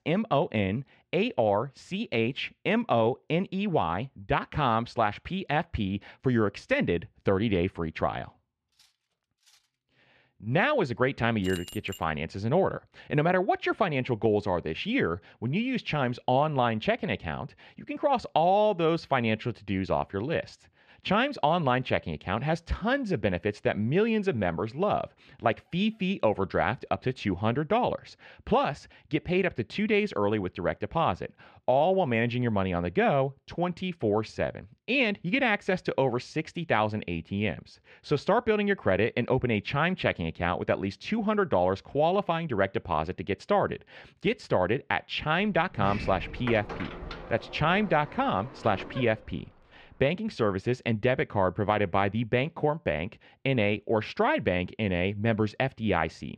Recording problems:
muffled; slightly; fading above 3 kHz
clattering dishes; very faint; at 8.5 s; peak 35 dB below the speech
jangling keys; faint; at 11 s; peak 15 dB below the speech
door banging; noticeable; from 46 to 49 s; peak 8 dB below the speech

